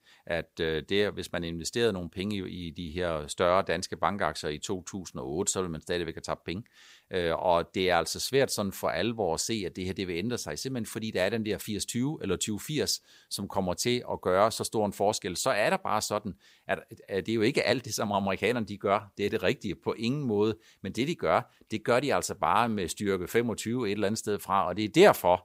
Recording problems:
none

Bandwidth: 15.5 kHz